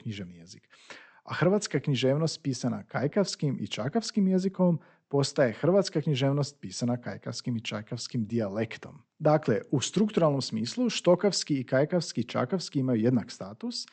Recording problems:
high frequencies cut off; noticeable; nothing above 8 kHz

